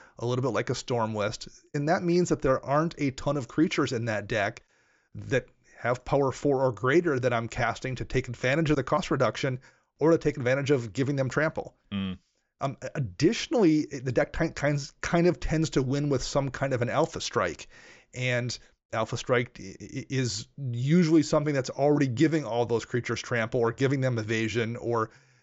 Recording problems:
high frequencies cut off; noticeable; nothing above 7.5 kHz

